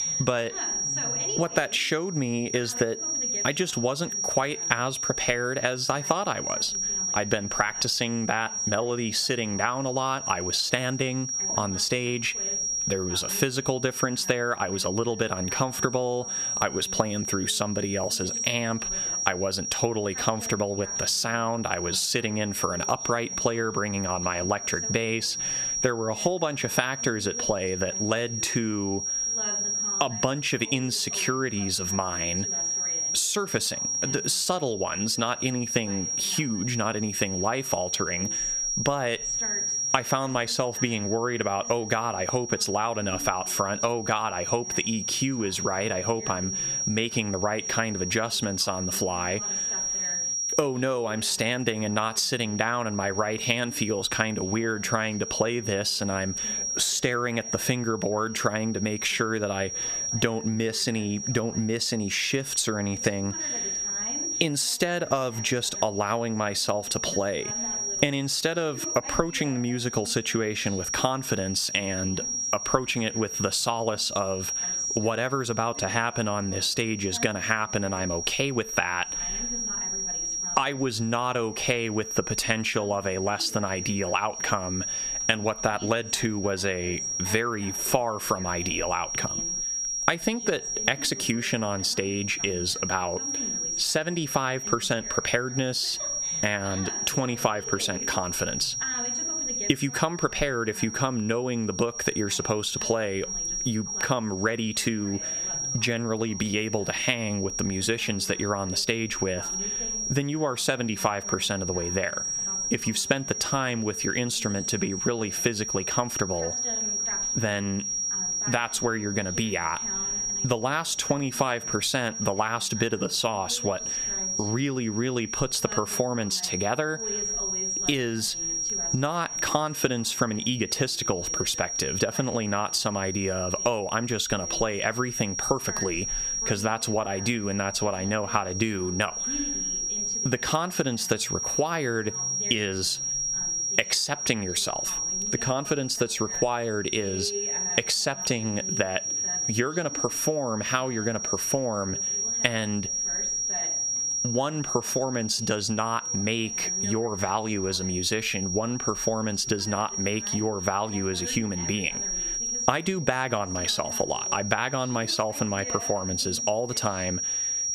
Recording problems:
squashed, flat; heavily, background pumping
high-pitched whine; loud; throughout; 5.5 kHz, 3 dB below the speech
voice in the background; noticeable; throughout; 20 dB below the speech

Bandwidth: 14.5 kHz